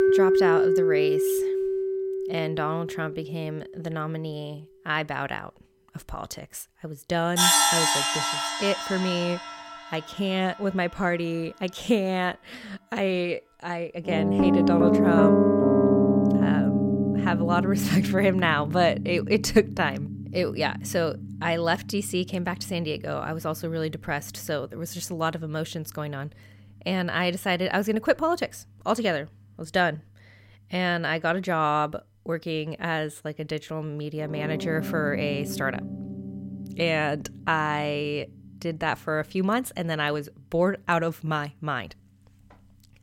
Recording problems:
background music; very loud; throughout; 3 dB above the speech

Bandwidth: 16.5 kHz